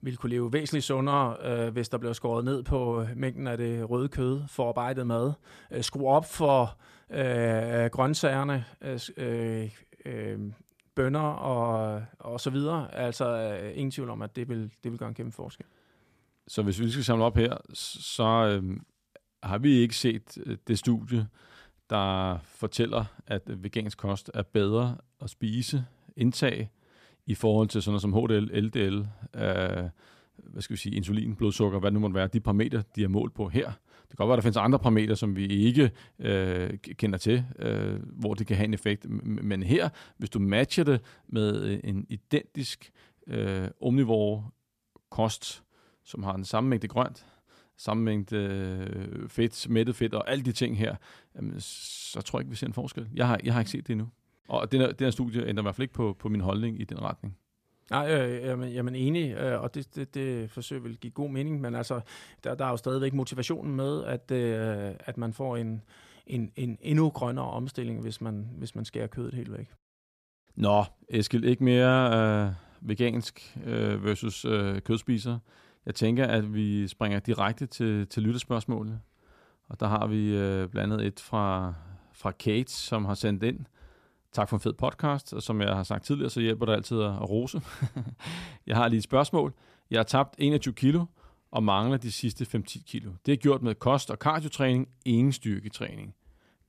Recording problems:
none

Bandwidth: 14.5 kHz